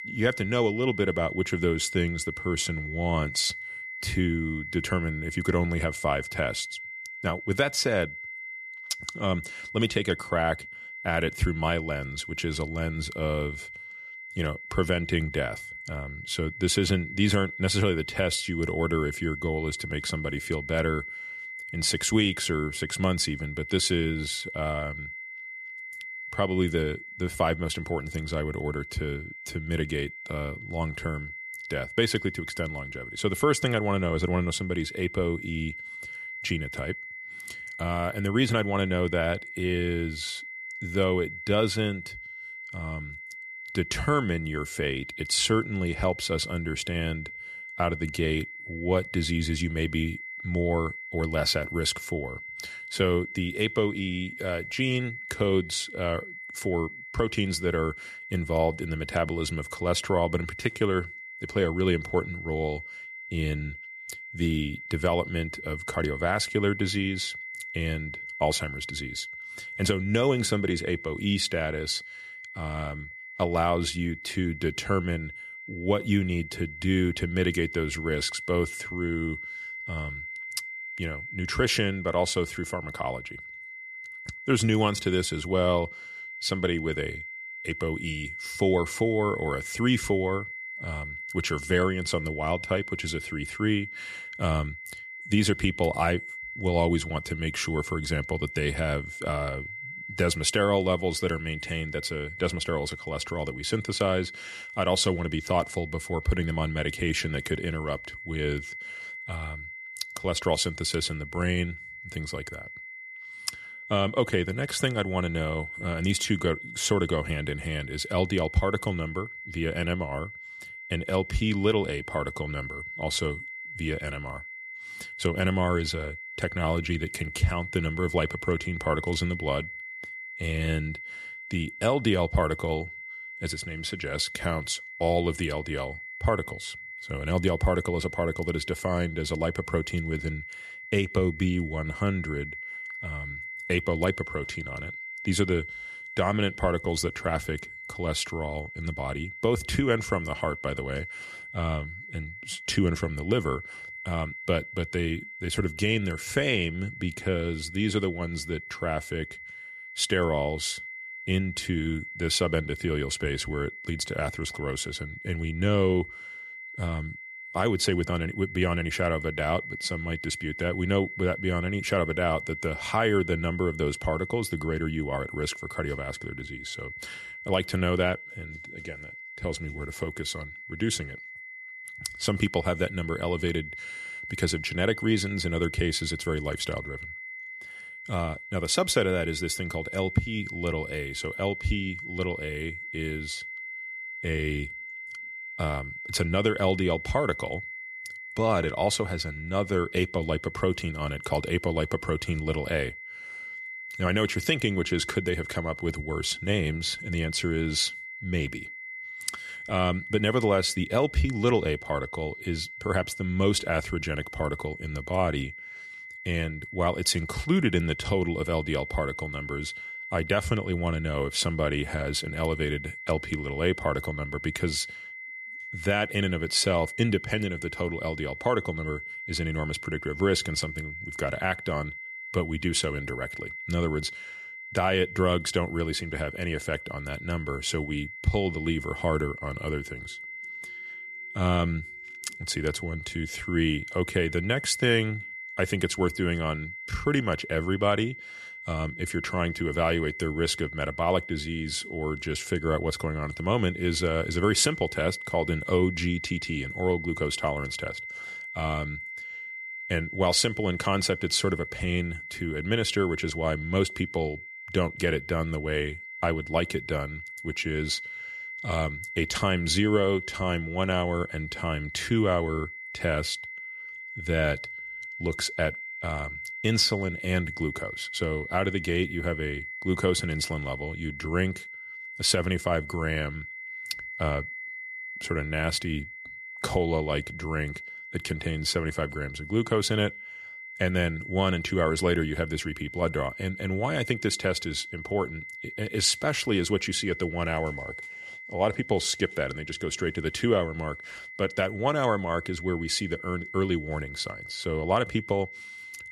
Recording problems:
high-pitched whine; loud; throughout; 2 kHz, 9 dB below the speech

